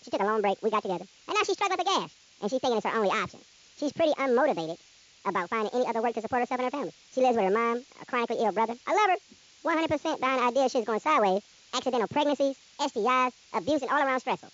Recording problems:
wrong speed and pitch; too fast and too high; 1.7 times normal speed
high frequencies cut off; noticeable; nothing above 7.5 kHz
hiss; faint; throughout; 25 dB below the speech

